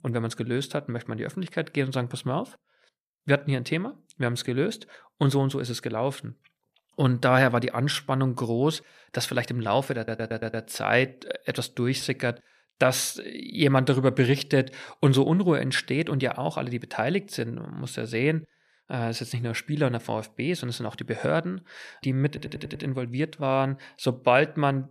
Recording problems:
audio stuttering; at 10 s and at 22 s

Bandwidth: 14.5 kHz